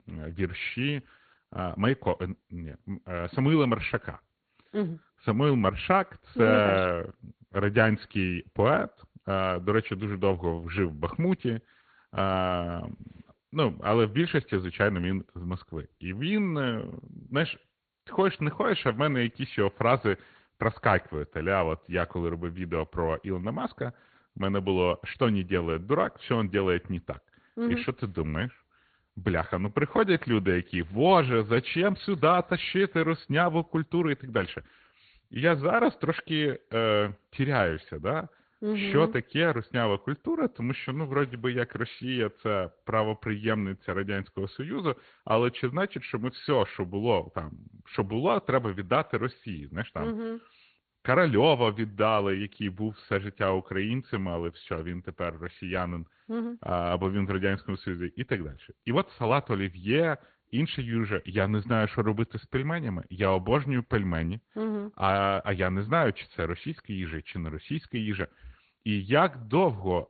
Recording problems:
high frequencies cut off; severe; nothing above 4.5 kHz
garbled, watery; slightly

